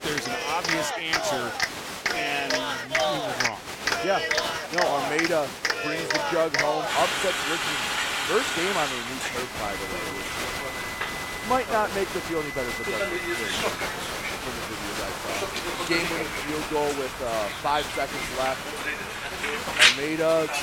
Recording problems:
crowd noise; very loud; throughout; 3 dB above the speech

